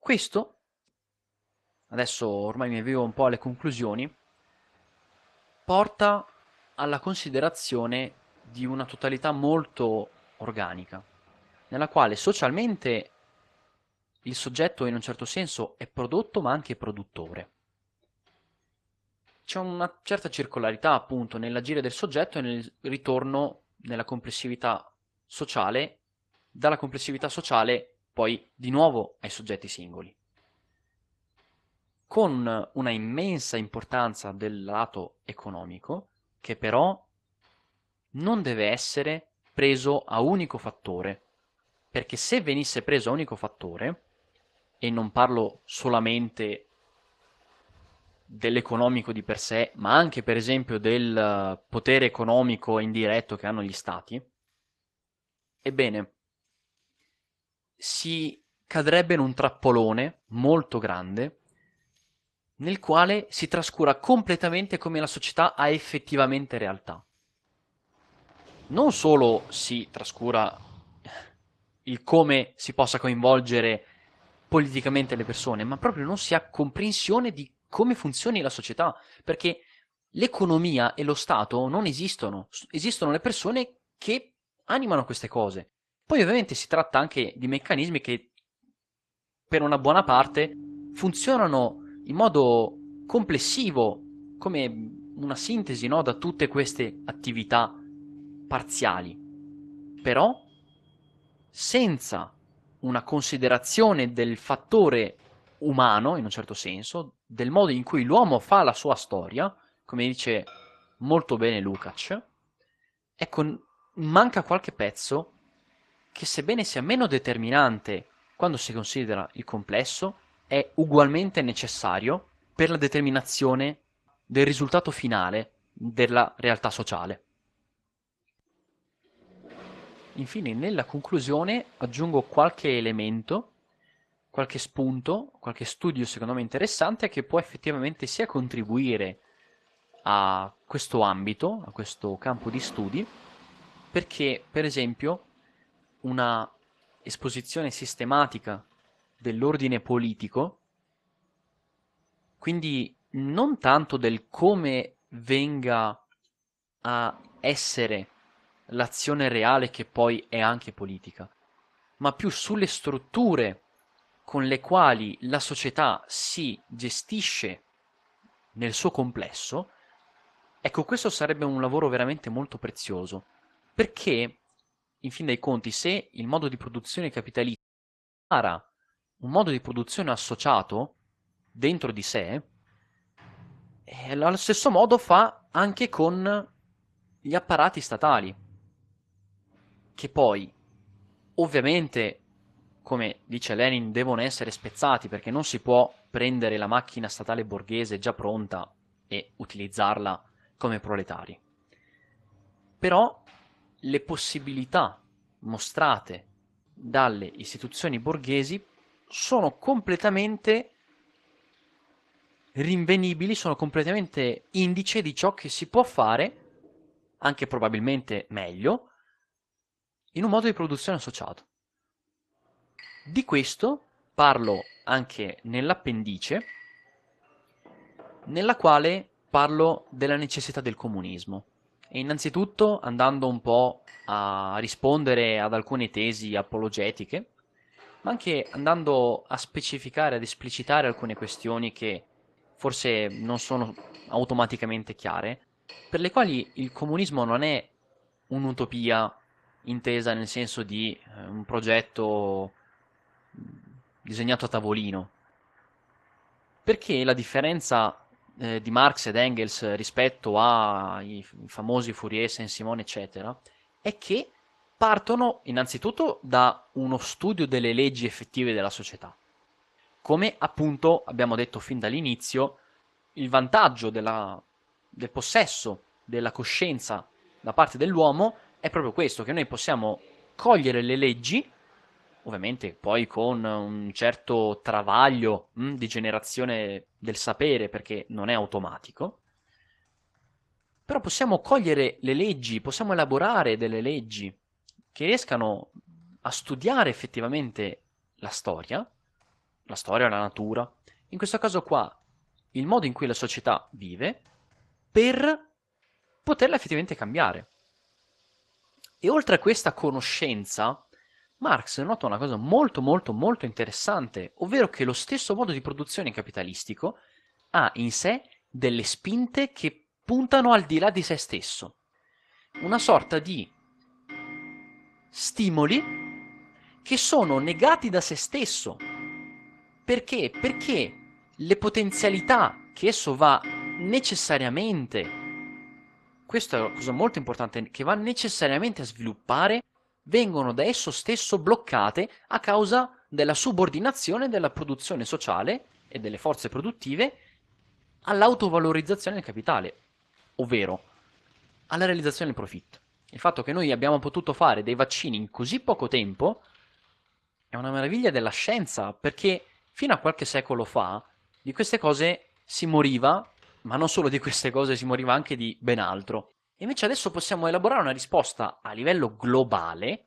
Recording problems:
garbled, watery; slightly; nothing above 12 kHz
household noises; noticeable; throughout; 20 dB below the speech
audio cutting out; at 2:58 for 0.5 s

